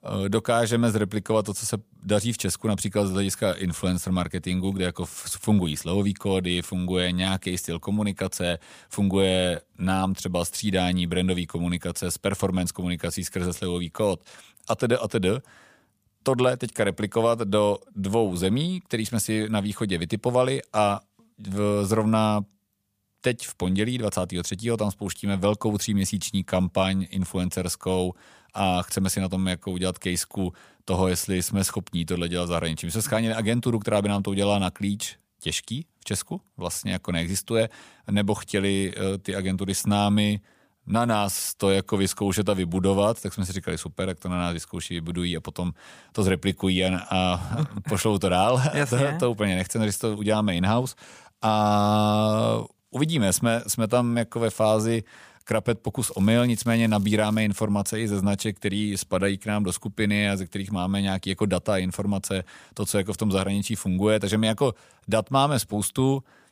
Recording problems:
crackling; faint; from 56 to 57 s; 25 dB below the speech

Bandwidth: 15 kHz